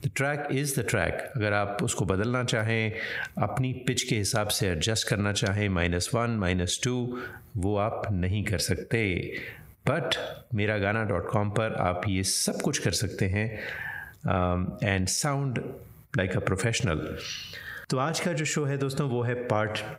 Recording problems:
squashed, flat; heavily

